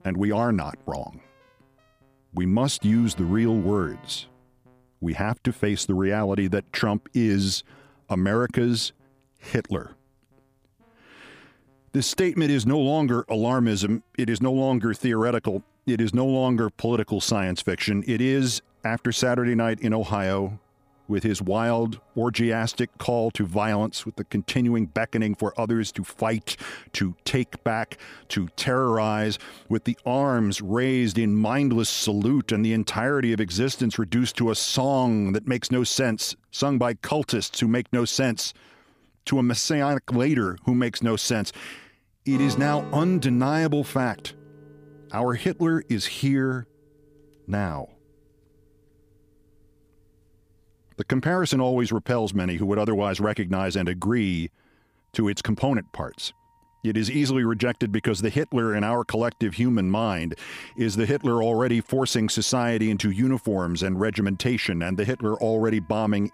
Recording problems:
background music; faint; throughout; 20 dB below the speech

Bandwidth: 15 kHz